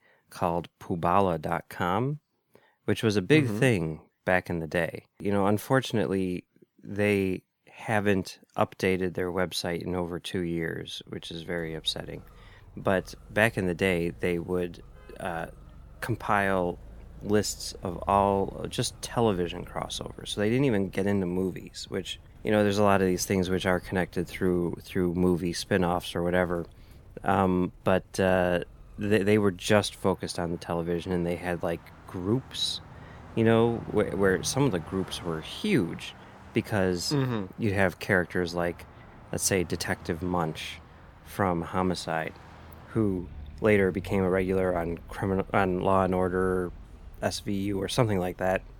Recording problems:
traffic noise; faint; from 11 s on; 20 dB below the speech

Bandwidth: 18.5 kHz